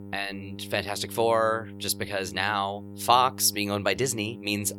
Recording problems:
electrical hum; faint; throughout; 50 Hz, 20 dB below the speech

